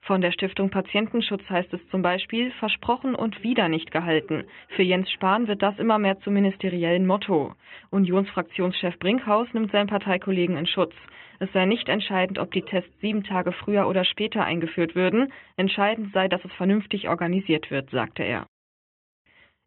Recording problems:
high frequencies cut off; severe; nothing above 3.5 kHz

